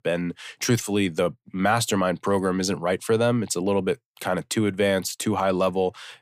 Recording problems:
none

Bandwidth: 15 kHz